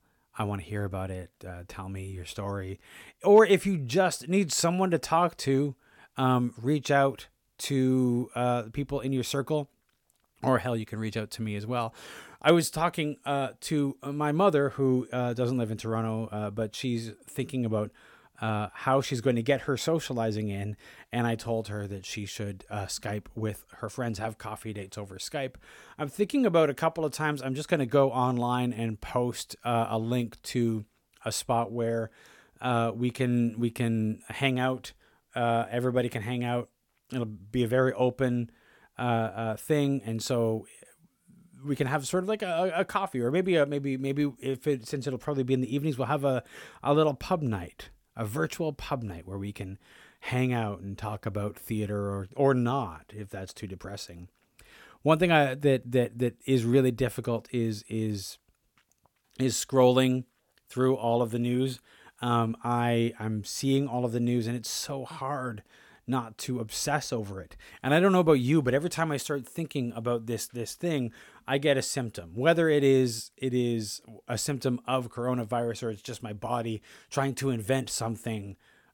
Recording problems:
none

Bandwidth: 17 kHz